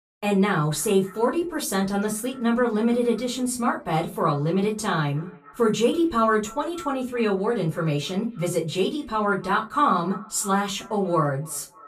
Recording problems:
off-mic speech; far
echo of what is said; faint; throughout; 290 ms later, 20 dB below the speech
room echo; very slight; dies away in 0.2 s

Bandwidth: 14.5 kHz